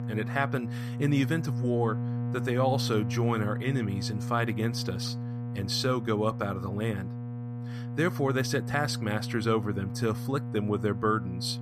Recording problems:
electrical hum; noticeable; throughout; 60 Hz, 10 dB below the speech

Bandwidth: 14.5 kHz